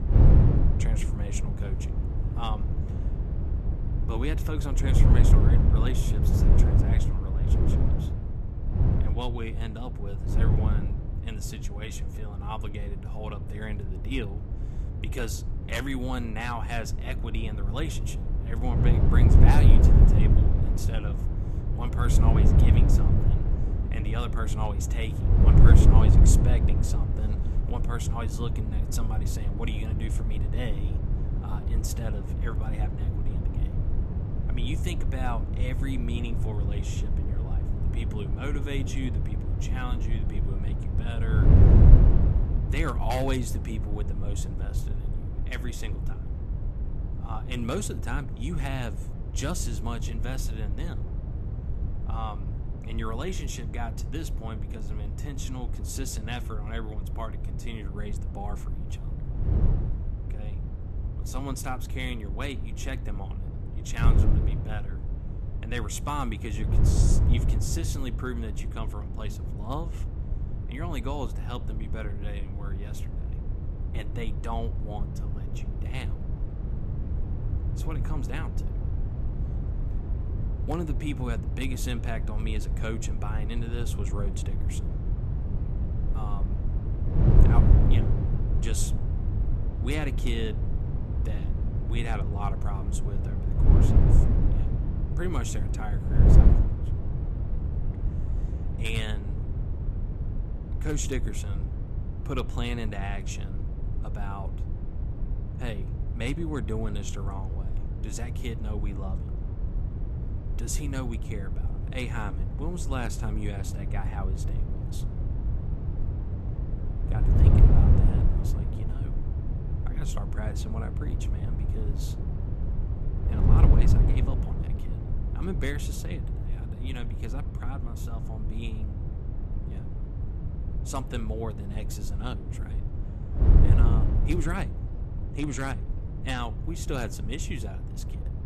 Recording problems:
wind noise on the microphone; heavy; 3 dB below the speech

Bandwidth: 13.5 kHz